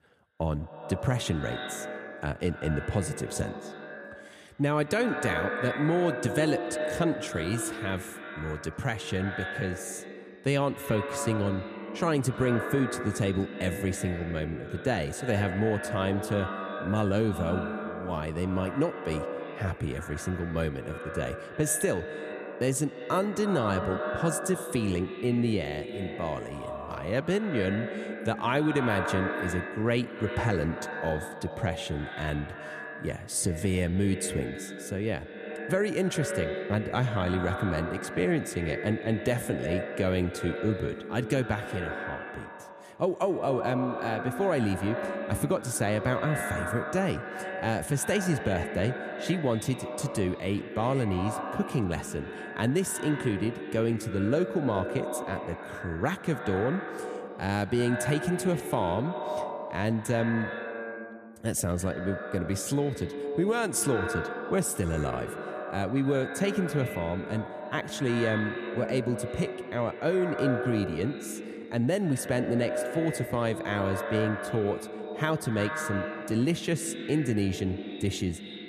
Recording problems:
echo of what is said; strong; throughout; 90 ms later, 6 dB below the speech

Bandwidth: 14.5 kHz